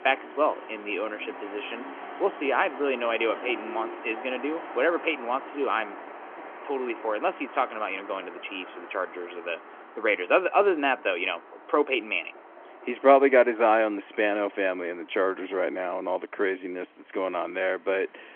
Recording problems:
phone-call audio
traffic noise; noticeable; throughout; 15 dB below the speech

